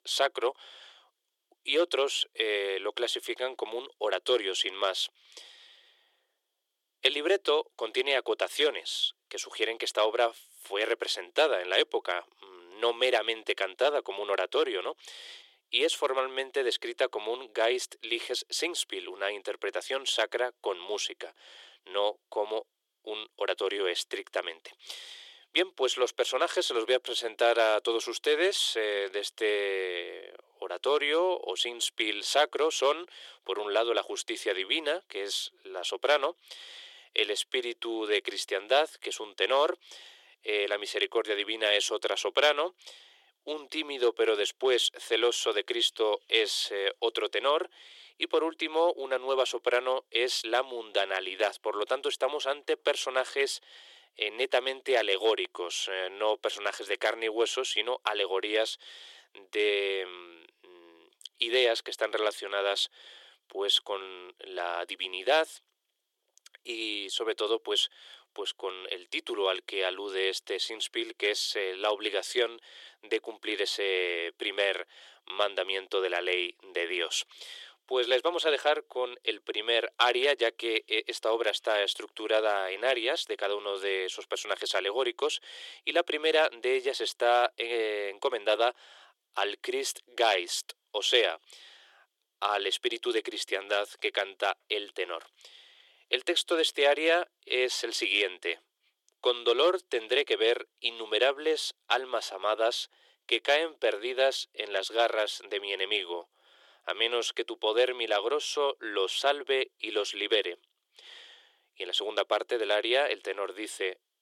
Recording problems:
thin; very; fading below 350 Hz

